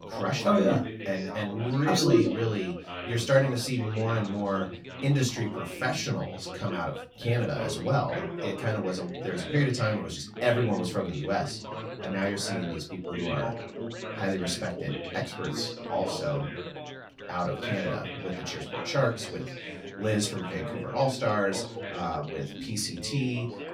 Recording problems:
off-mic speech; far
room echo; very slight; dies away in 0.2 s
background chatter; loud; throughout; 3 voices, 9 dB below the speech

